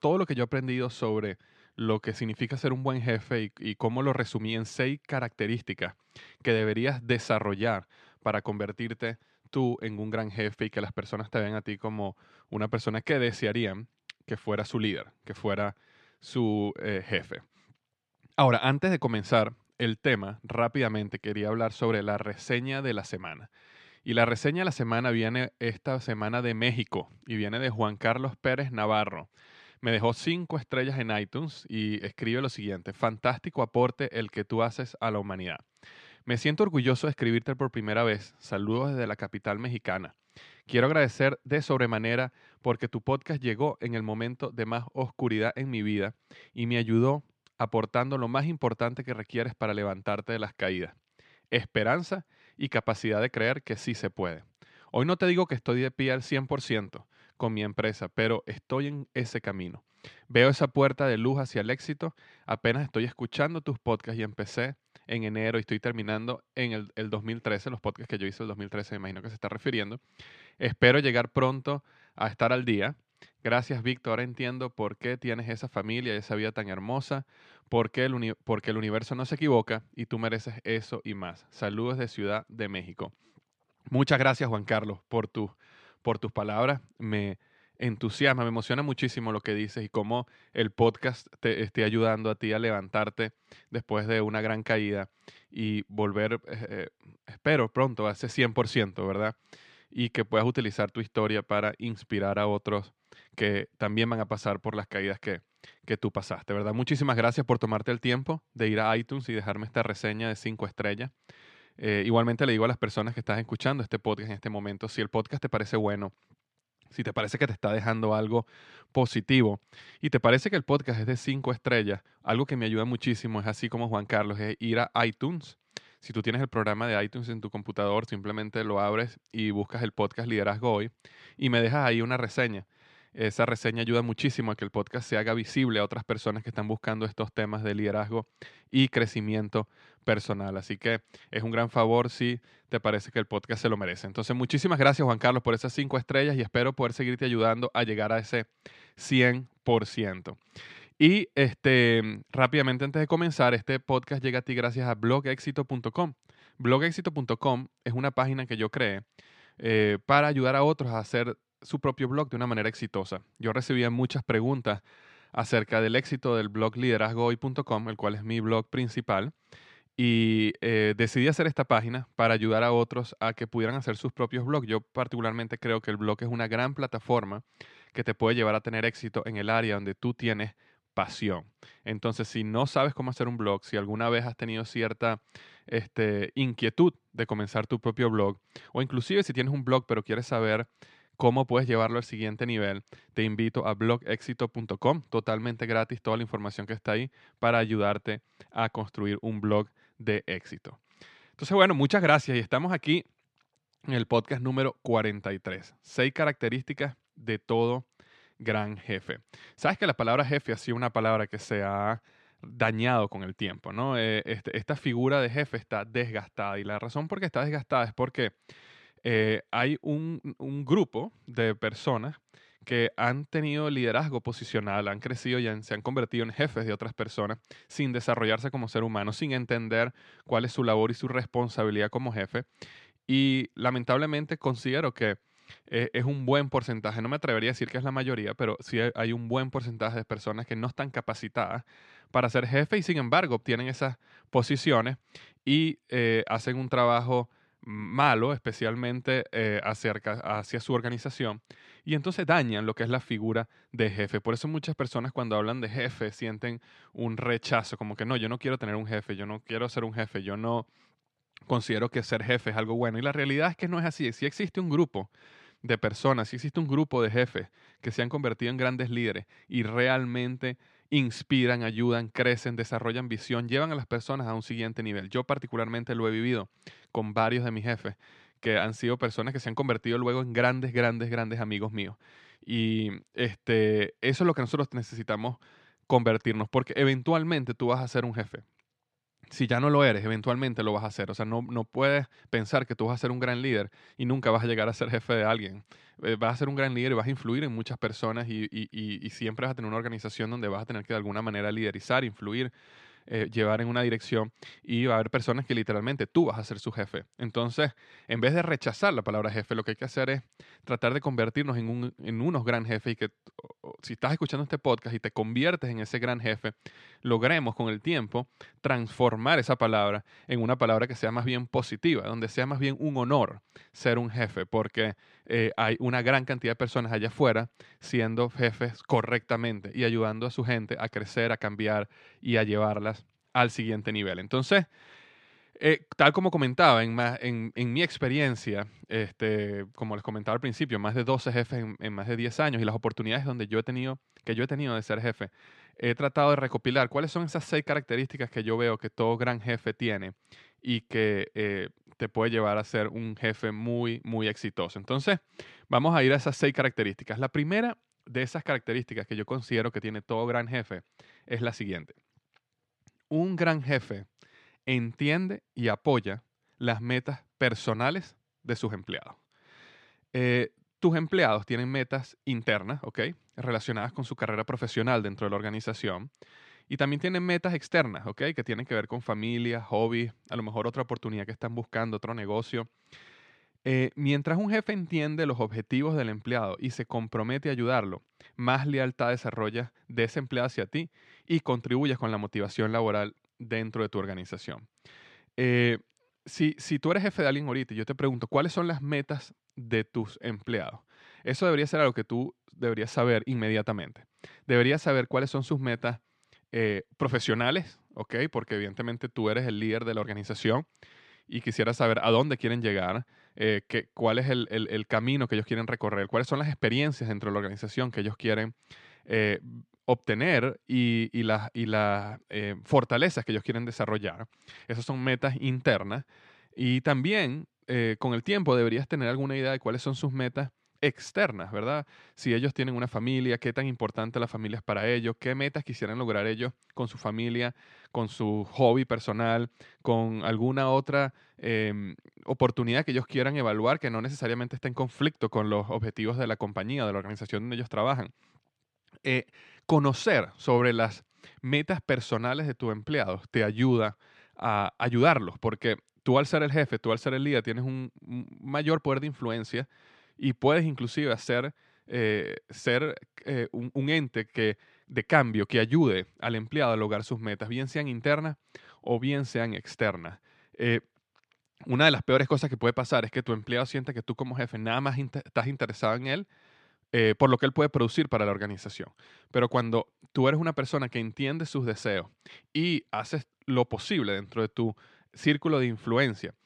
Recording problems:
none

